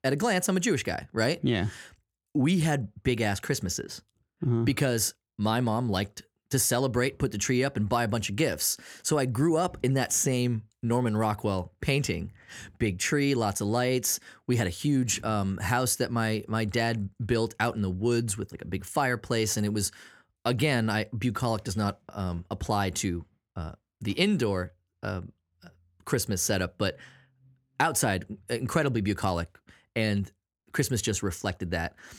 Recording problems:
none

